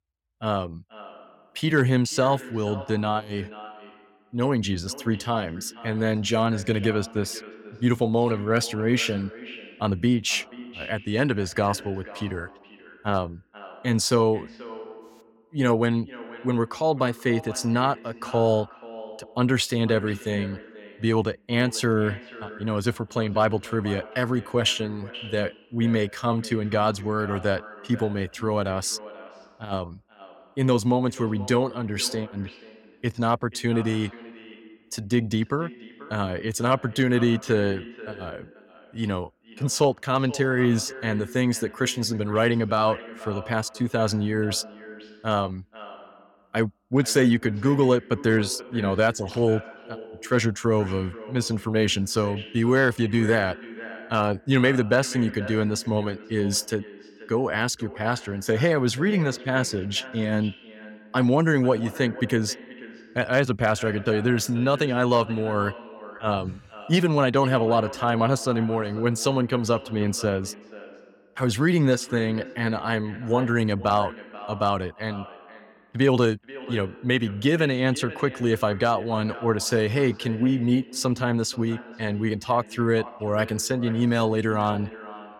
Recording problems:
echo of what is said; noticeable; throughout; 480 ms later, 15 dB below the speech

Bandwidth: 17 kHz